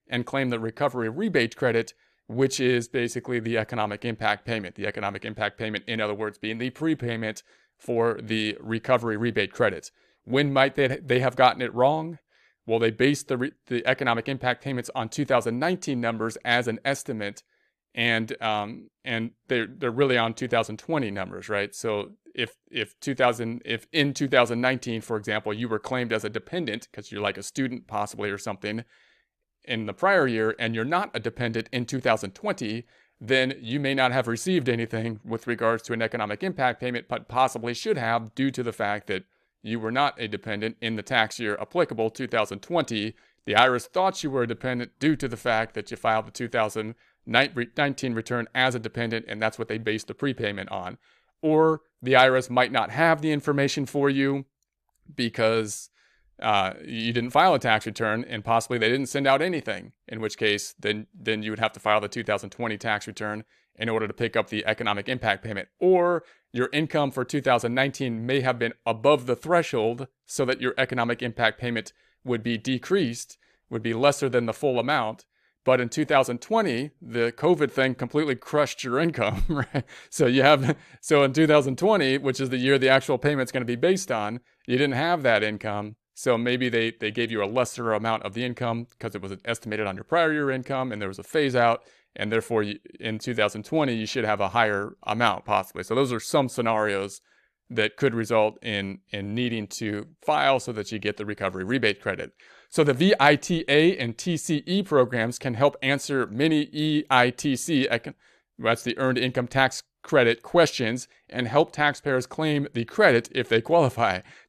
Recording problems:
none

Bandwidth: 14 kHz